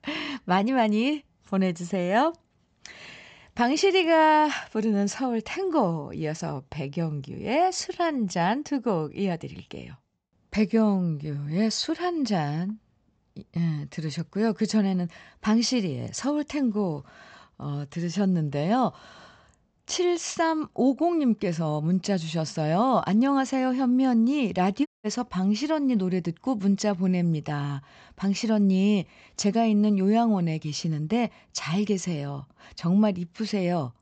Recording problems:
high frequencies cut off; noticeable; nothing above 8 kHz
audio cutting out; at 25 s

